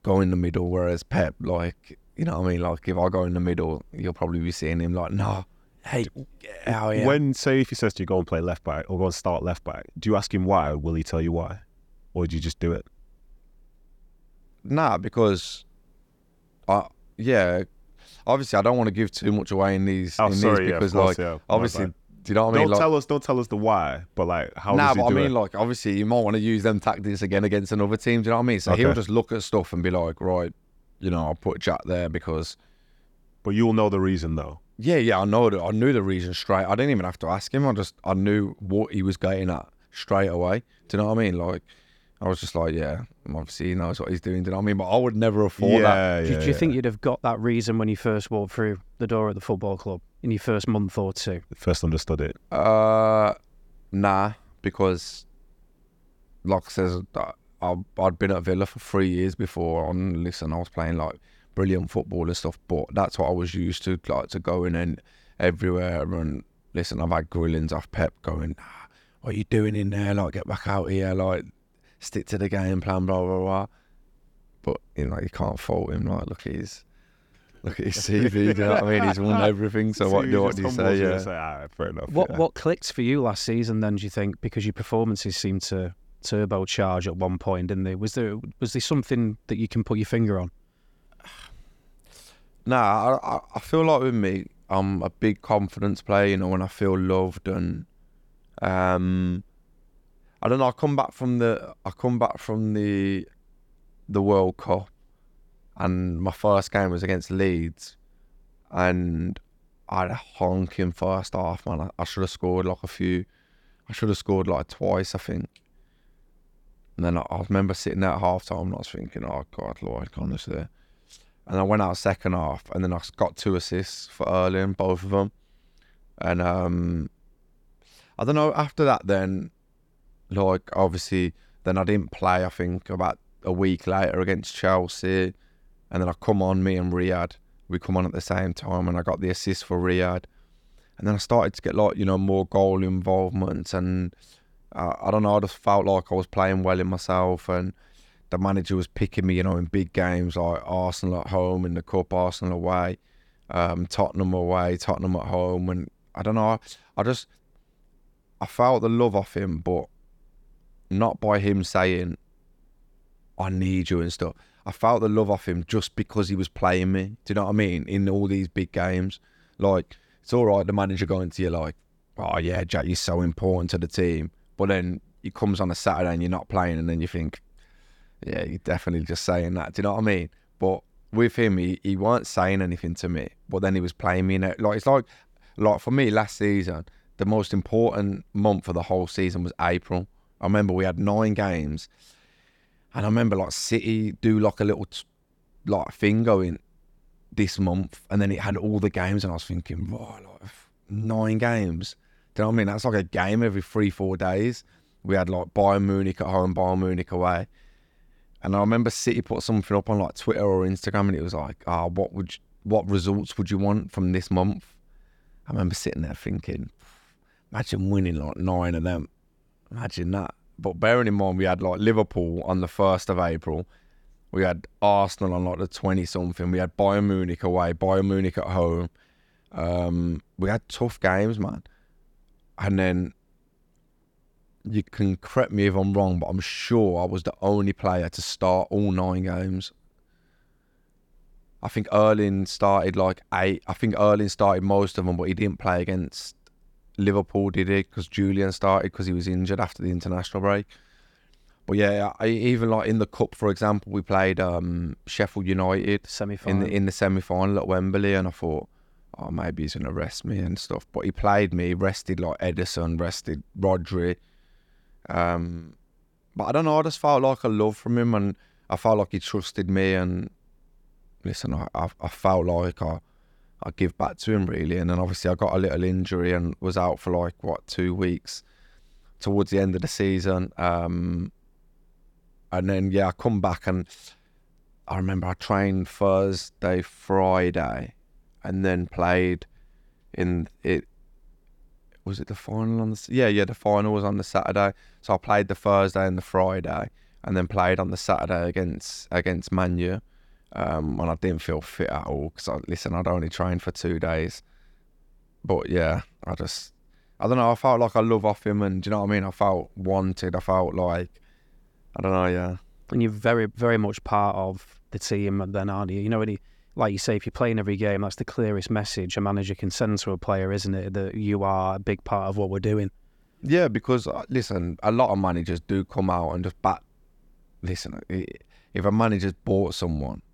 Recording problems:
none

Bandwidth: 18 kHz